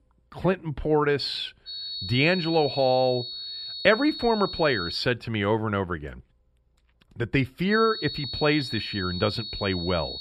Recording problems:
high-pitched whine; loud; from 1.5 to 5 s and from 7.5 s on; 4.5 kHz, 8 dB below the speech

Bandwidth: 14 kHz